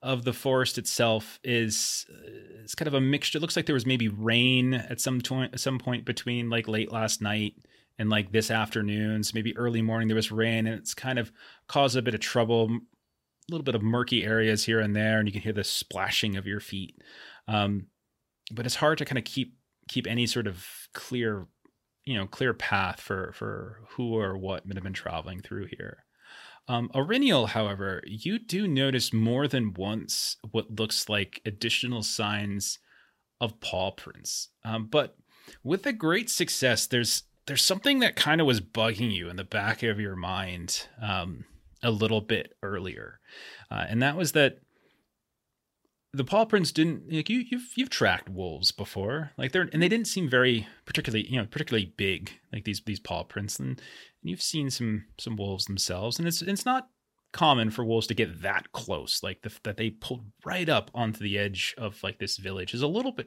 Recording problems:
none

